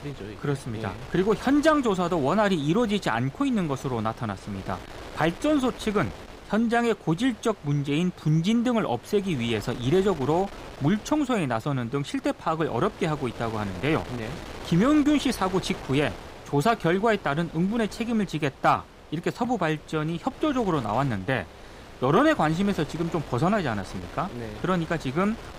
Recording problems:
wind noise on the microphone; occasional gusts; 15 dB below the speech

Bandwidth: 15.5 kHz